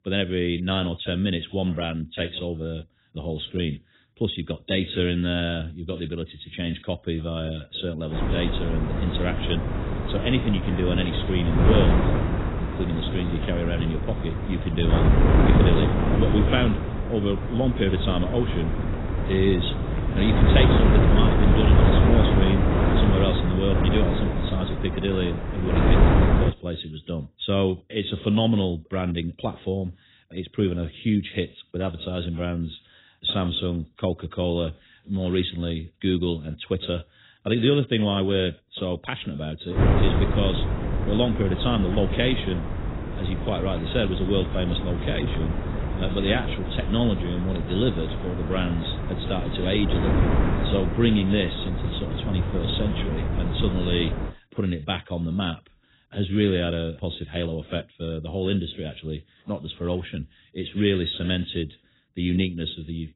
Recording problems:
garbled, watery; badly; nothing above 4 kHz
wind noise on the microphone; heavy; from 8 to 26 s and from 40 to 54 s; 1 dB below the speech

